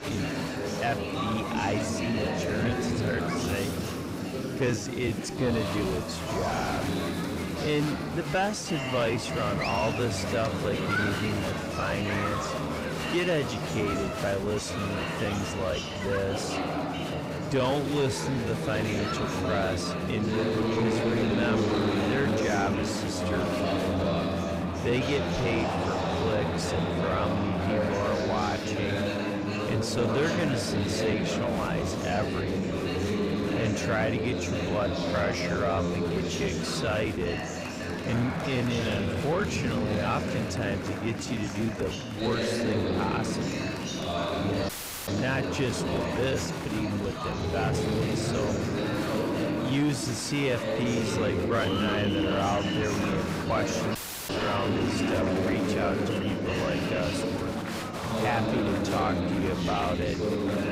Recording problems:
wrong speed, natural pitch; too slow; 0.7 times normal speed
distortion; slight; 10 dB below the speech
murmuring crowd; very loud; throughout; 1 dB above the speech
audio cutting out; at 45 s and at 54 s

